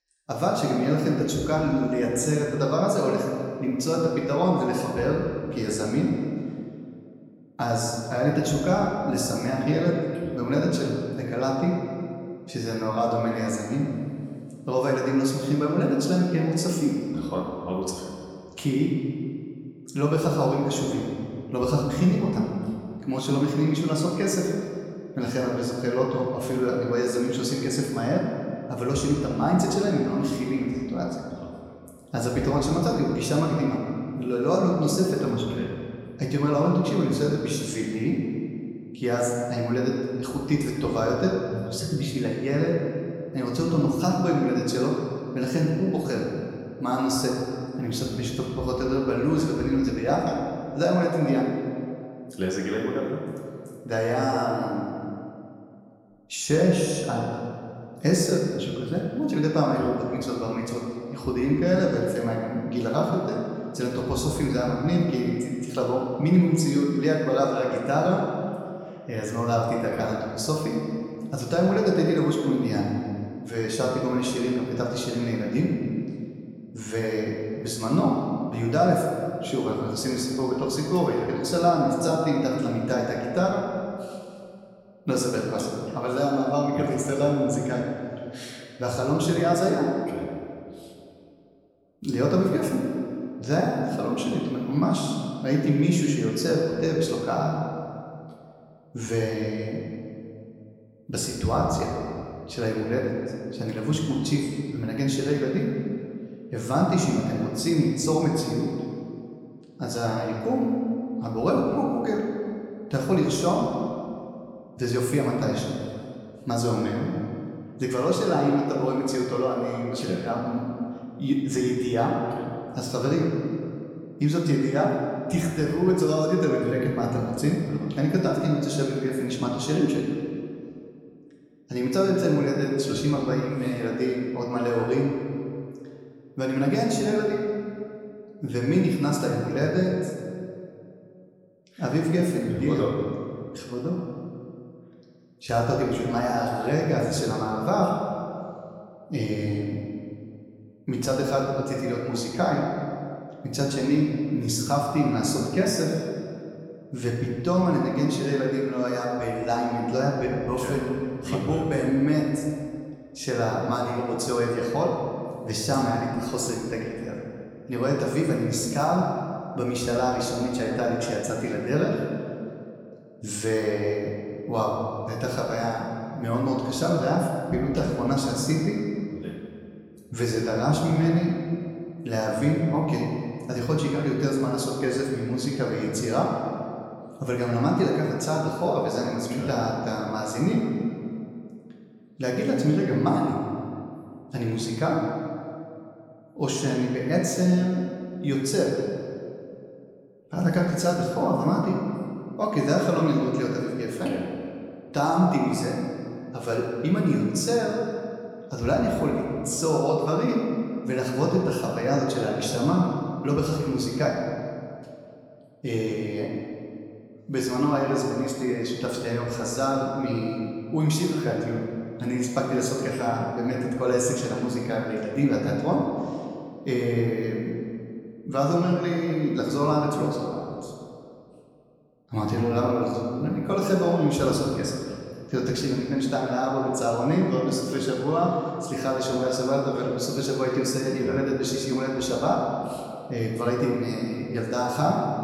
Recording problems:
off-mic speech; far
room echo; noticeable; dies away in 2 s

